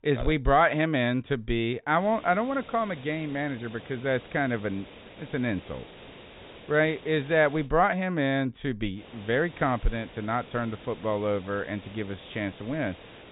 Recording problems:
high frequencies cut off; severe; nothing above 4 kHz
hiss; noticeable; from 2 to 7.5 s and from 9 s on; 20 dB below the speech

